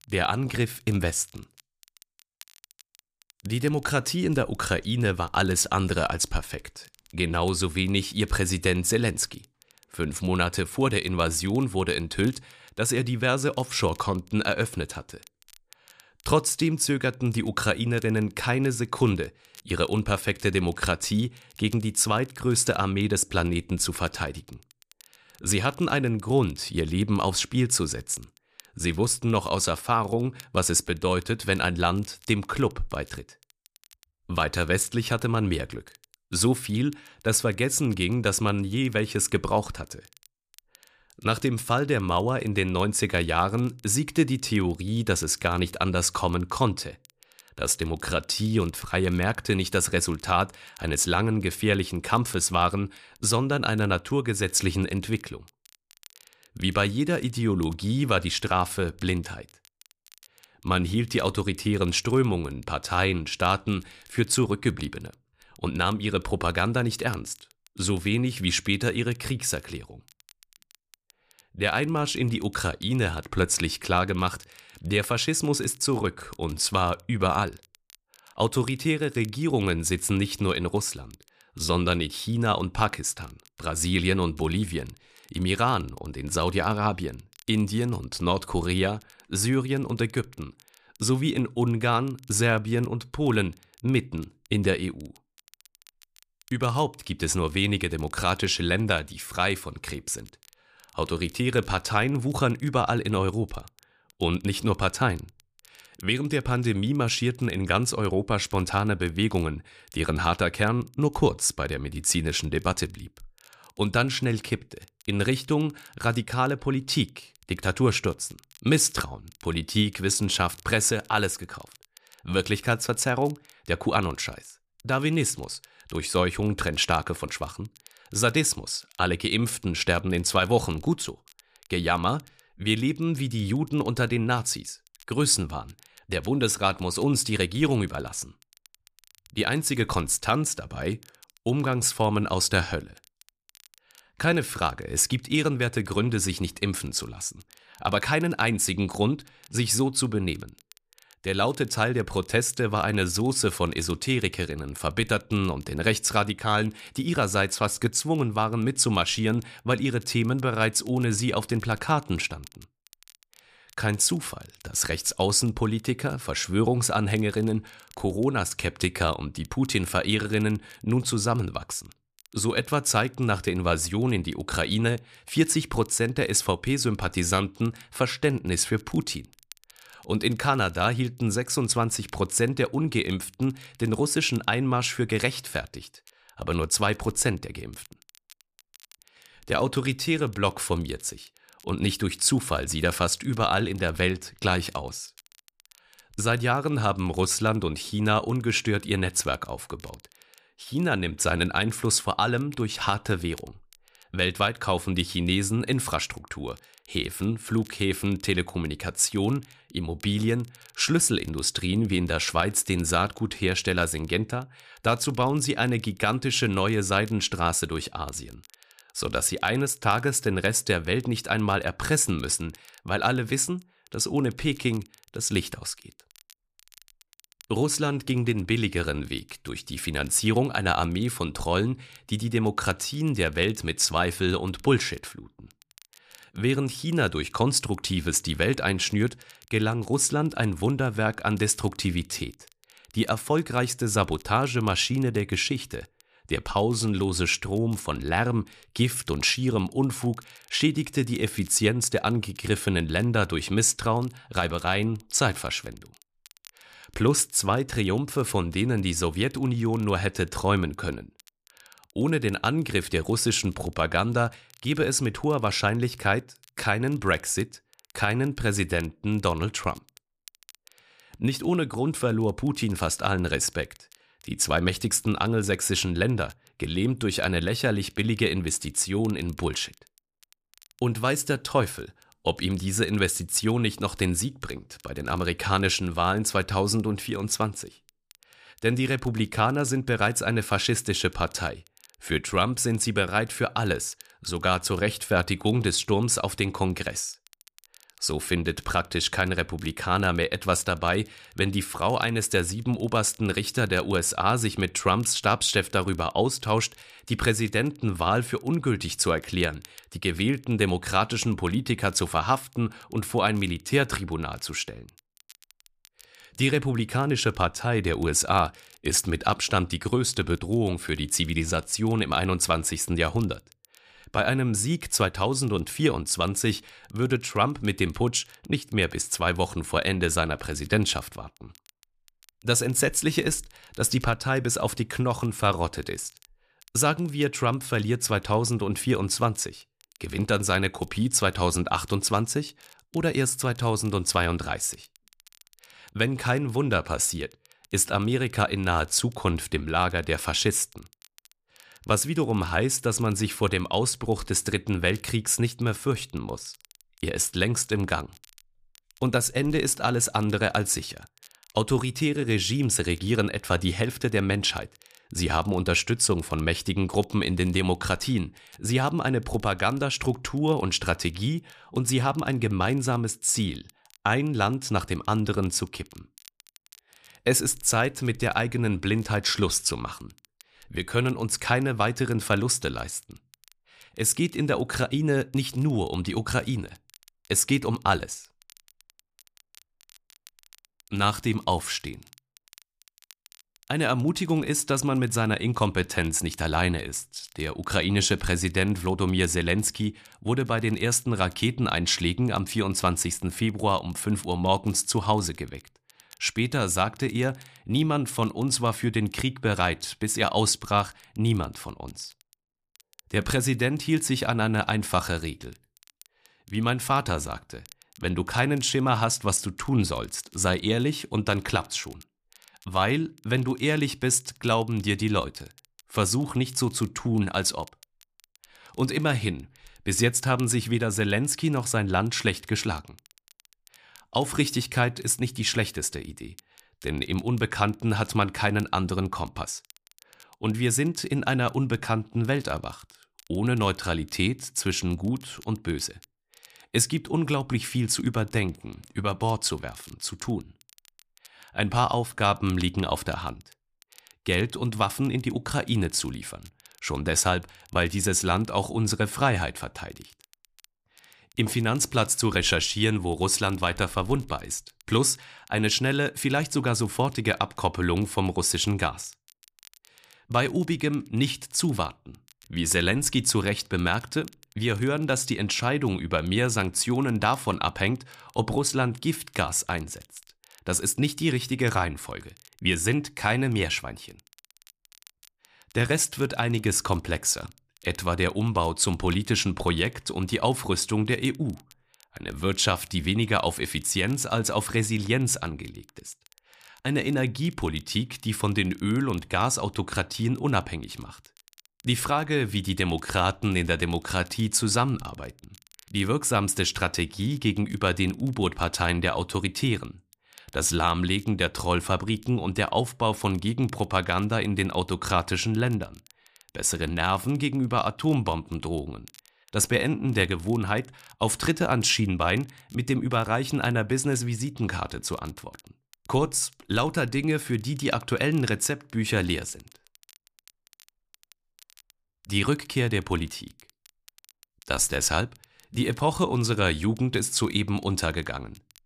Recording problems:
crackle, like an old record; faint; 30 dB below the speech

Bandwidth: 14.5 kHz